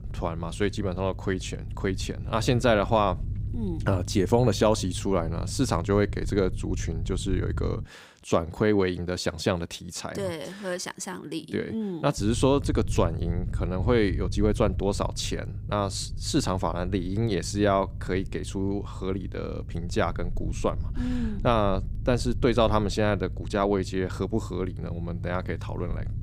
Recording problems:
low rumble; faint; until 8 s and from 12 s on; 20 dB below the speech

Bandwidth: 15.5 kHz